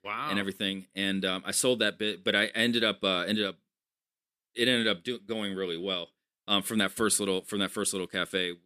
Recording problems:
none

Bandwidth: 14.5 kHz